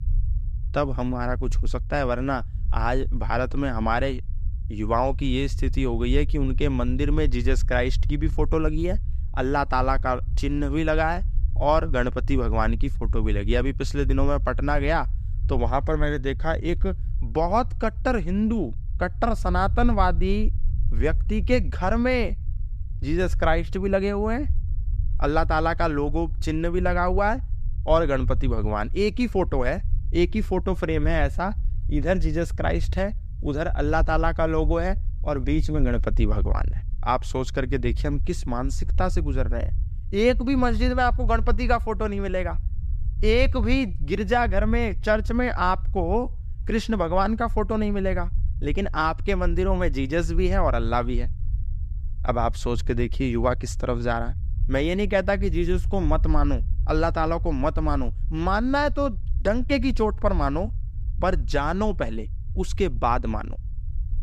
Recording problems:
low rumble; faint; throughout; 25 dB below the speech

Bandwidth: 14.5 kHz